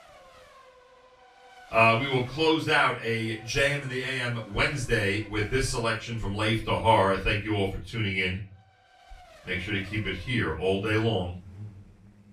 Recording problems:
off-mic speech; far
room echo; slight; dies away in 0.3 s
traffic noise; faint; throughout; 25 dB below the speech

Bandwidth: 15 kHz